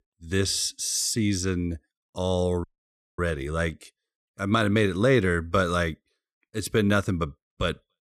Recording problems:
audio cutting out; at 2.5 s for 0.5 s

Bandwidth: 13.5 kHz